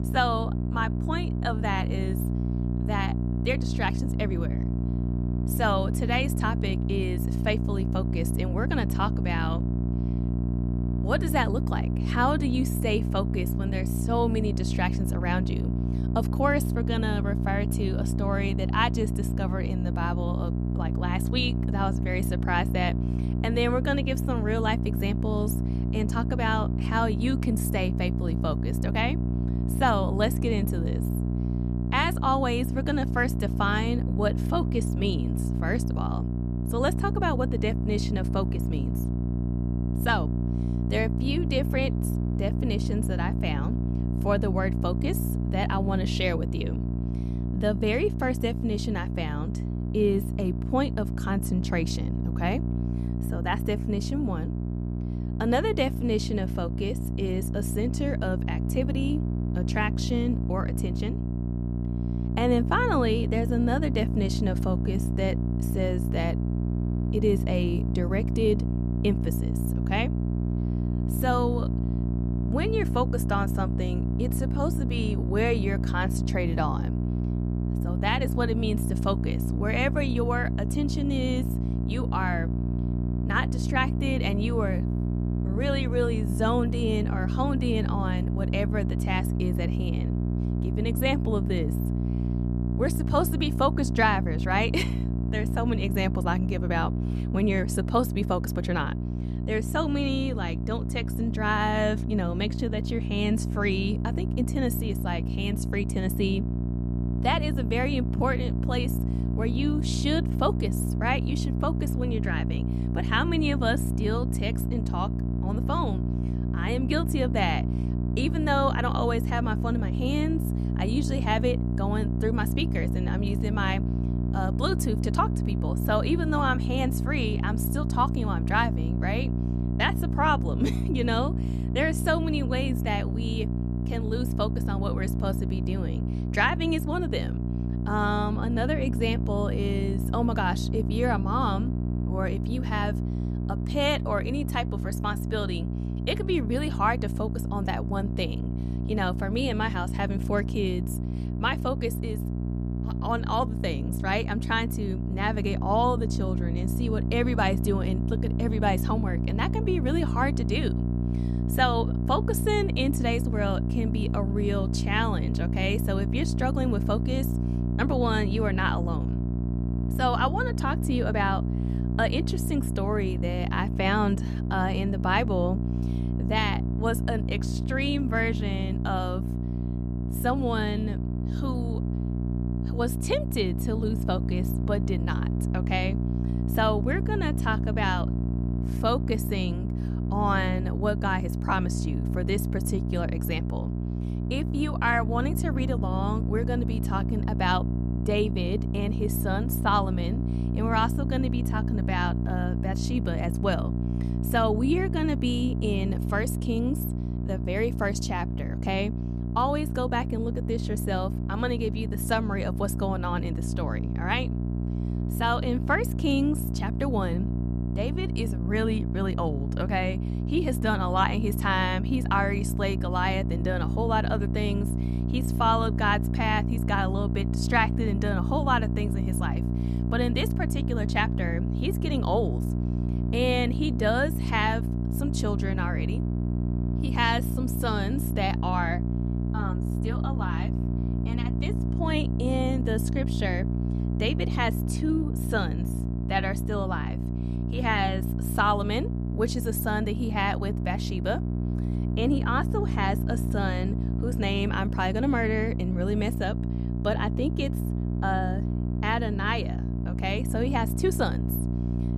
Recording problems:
electrical hum; loud; throughout; 60 Hz, 8 dB below the speech

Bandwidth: 14 kHz